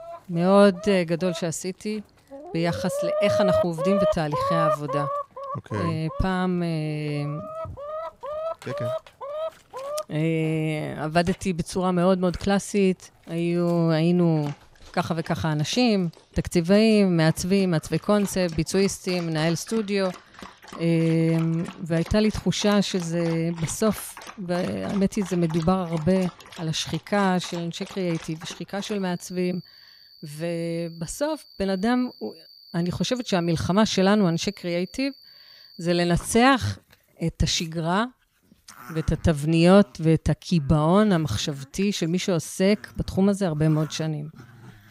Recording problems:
animal sounds; loud; throughout; 9 dB below the speech

